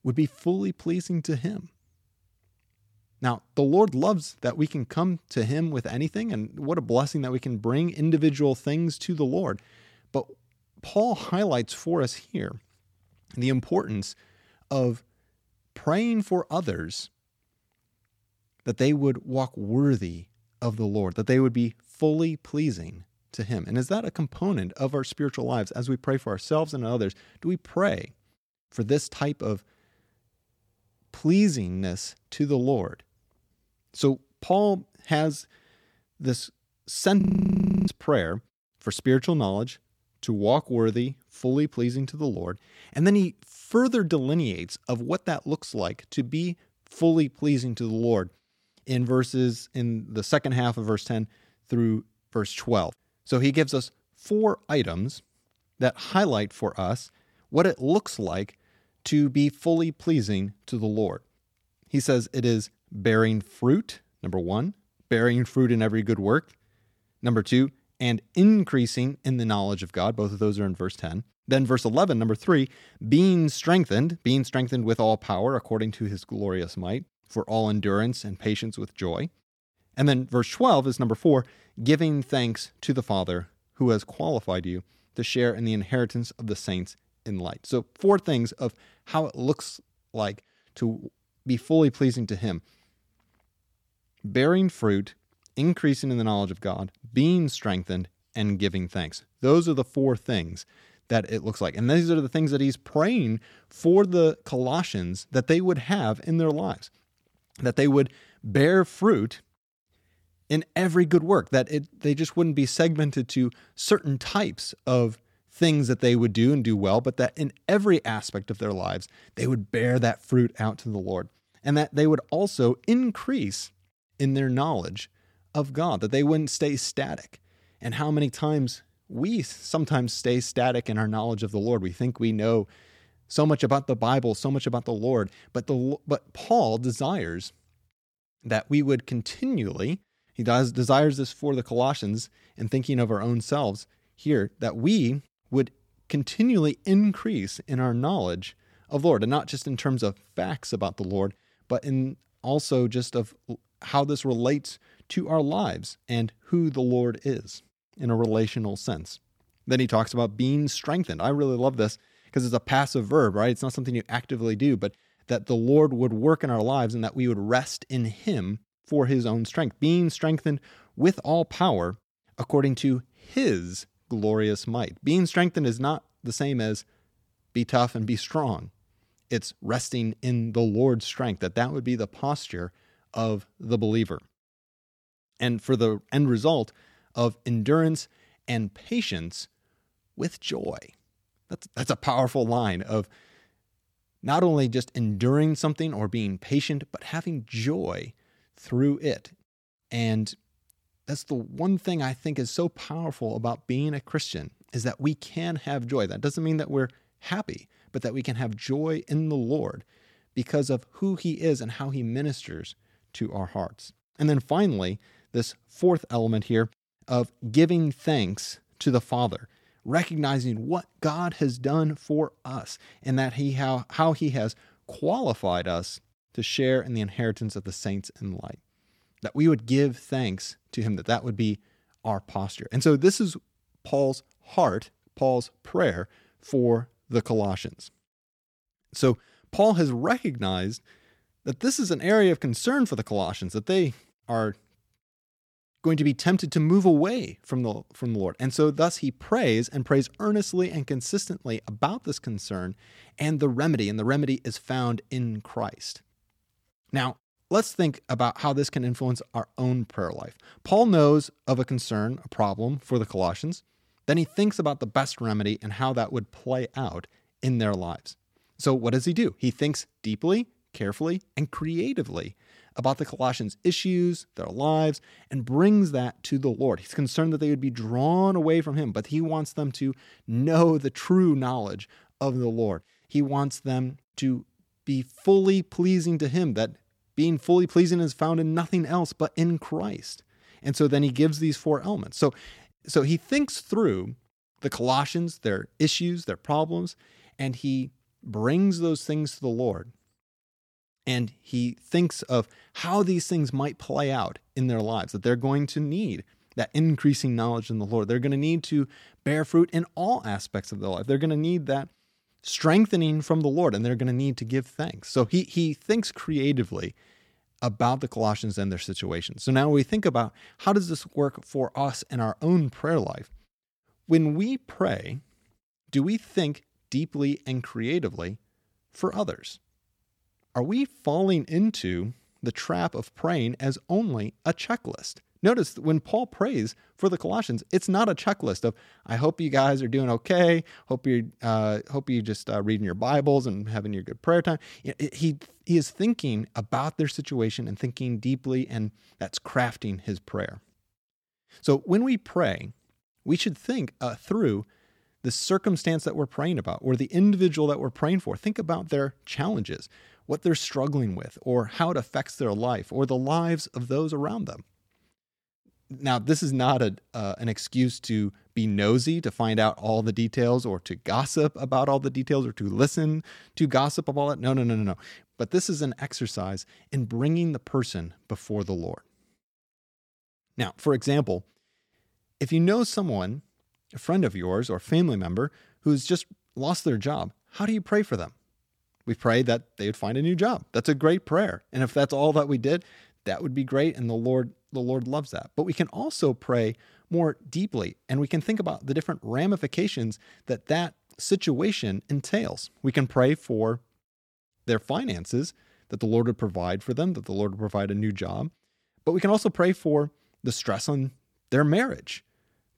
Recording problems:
audio freezing; at 37 s for 0.5 s

